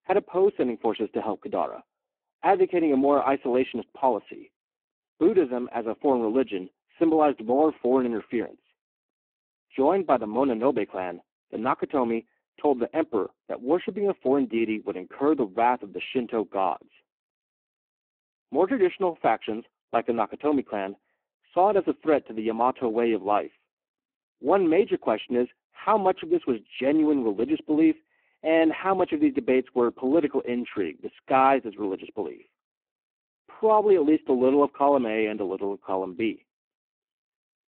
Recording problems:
phone-call audio; poor line

